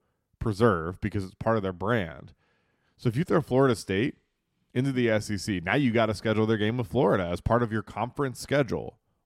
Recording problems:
none

